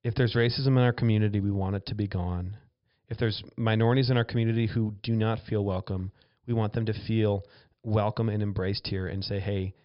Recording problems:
high frequencies cut off; noticeable; nothing above 5.5 kHz

